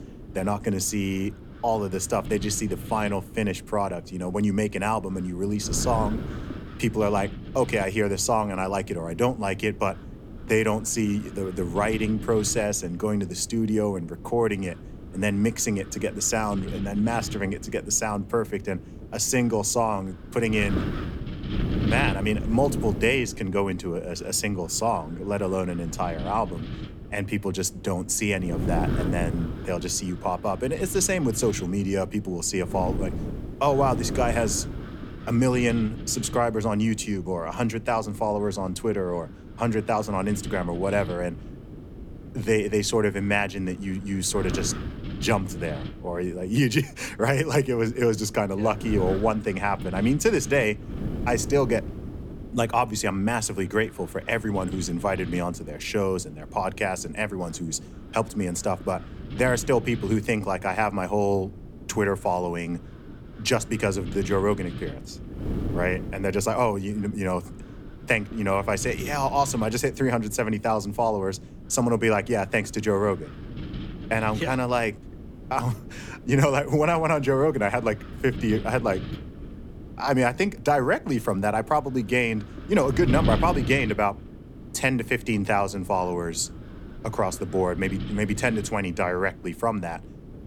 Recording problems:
wind noise on the microphone; occasional gusts; 15 dB below the speech

